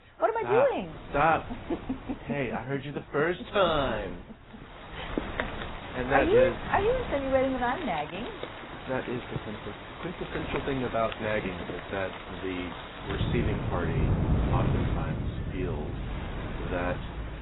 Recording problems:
garbled, watery; badly; nothing above 4 kHz
rain or running water; loud; from 5 s on; 5 dB below the speech
wind noise on the microphone; occasional gusts; 15 dB below the speech

